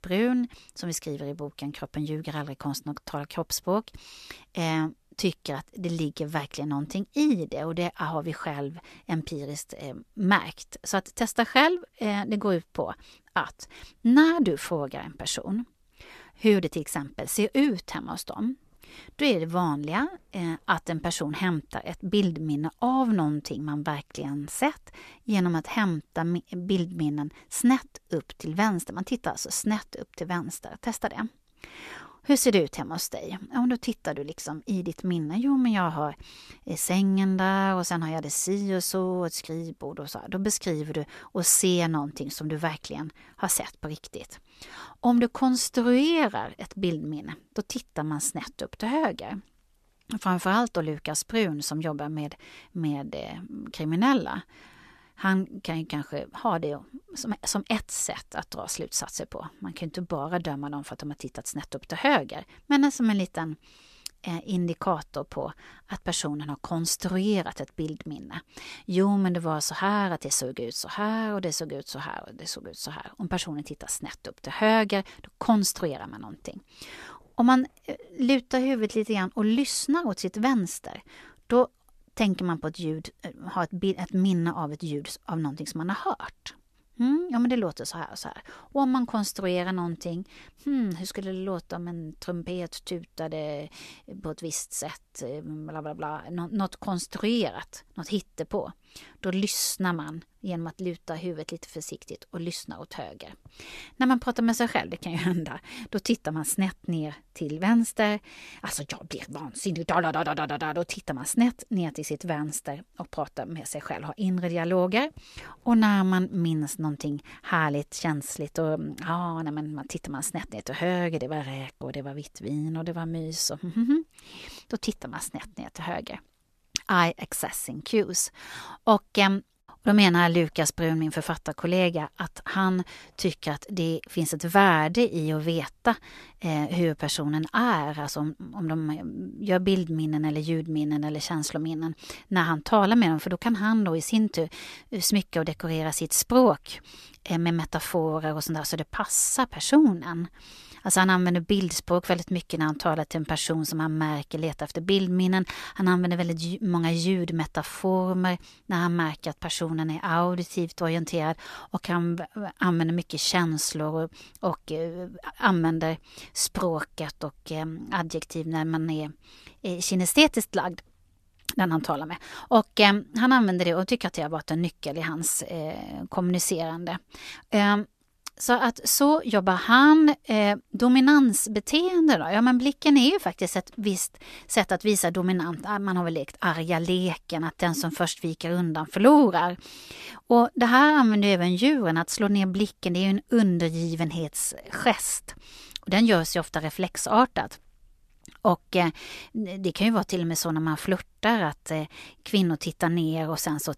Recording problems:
uneven, jittery; strongly; from 16 s to 3:08

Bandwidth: 14 kHz